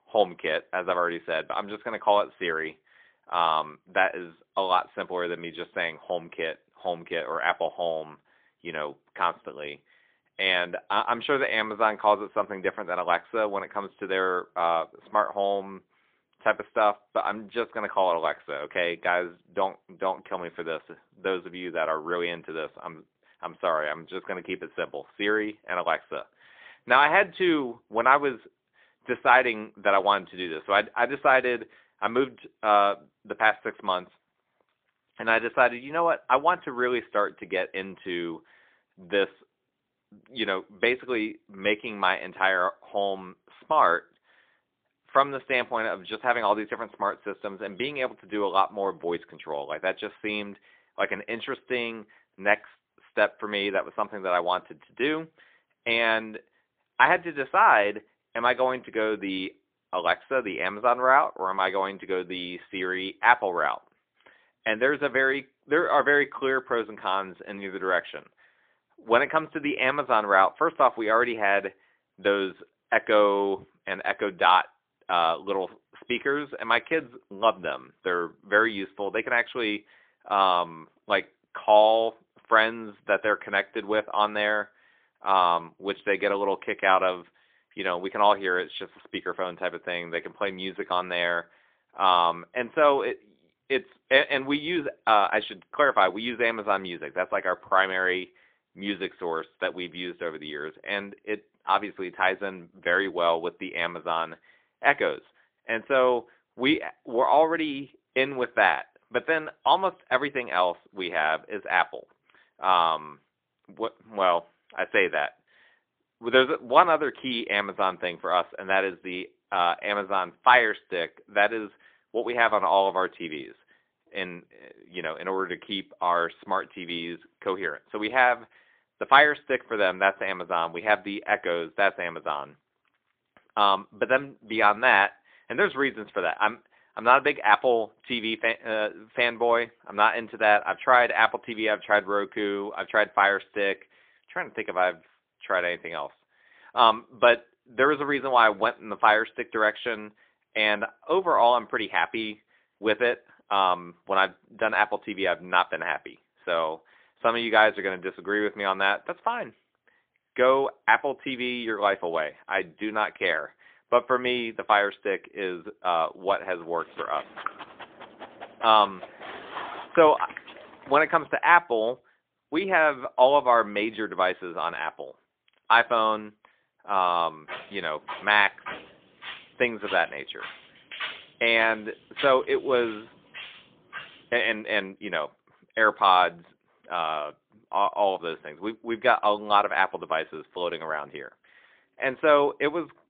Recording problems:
phone-call audio; poor line; nothing above 3.5 kHz
dog barking; faint; from 2:47 to 2:51; peak 10 dB below the speech
footsteps; noticeable; from 2:57 to 3:04; peak 9 dB below the speech

